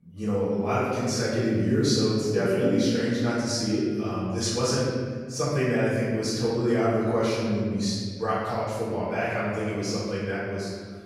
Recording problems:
room echo; strong; dies away in 1.9 s
off-mic speech; far

